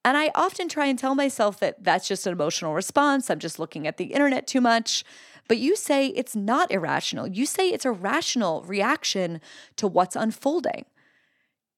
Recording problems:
none

